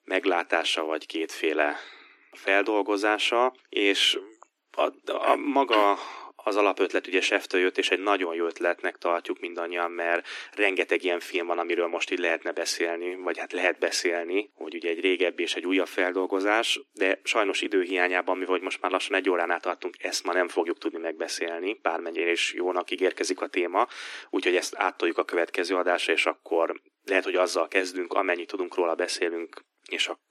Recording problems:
thin; somewhat; fading below 300 Hz

